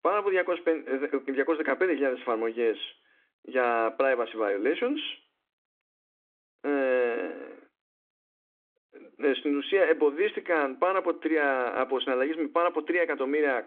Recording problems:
phone-call audio; nothing above 3.5 kHz

